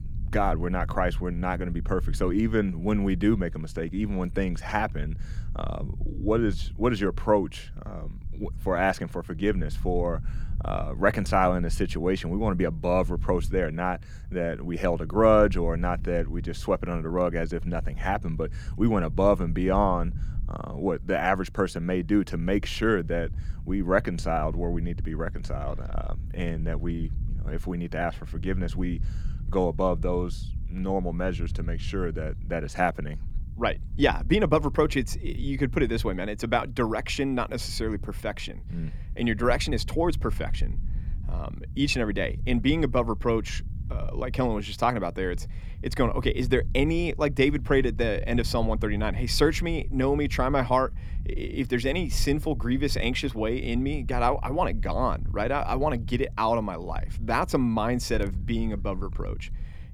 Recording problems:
low rumble; faint; throughout; 25 dB below the speech

